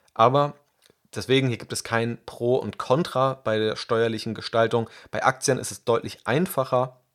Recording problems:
none

